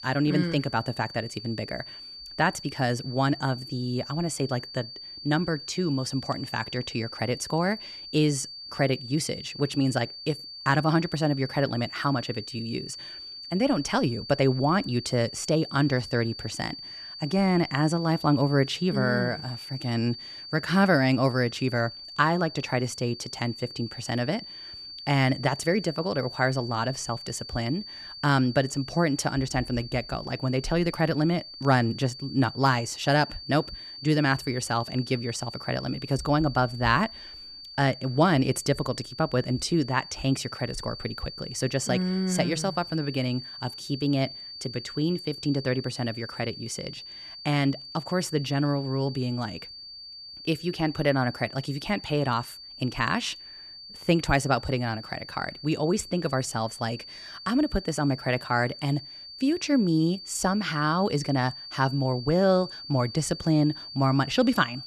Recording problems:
high-pitched whine; noticeable; throughout; 4.5 kHz, 10 dB below the speech

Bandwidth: 13.5 kHz